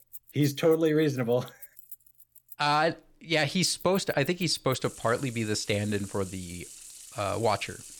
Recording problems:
household noises; noticeable; throughout; 20 dB below the speech

